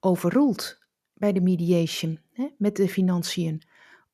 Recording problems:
none

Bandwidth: 14 kHz